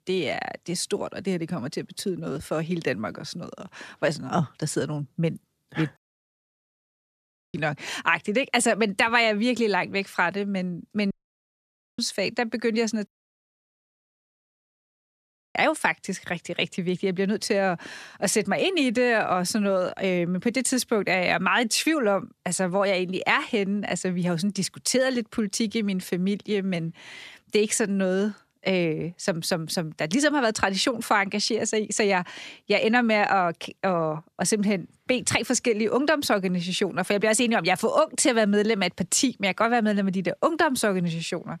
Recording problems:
audio cutting out; at 6 s for 1.5 s, at 11 s for 1 s and at 13 s for 2.5 s

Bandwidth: 14 kHz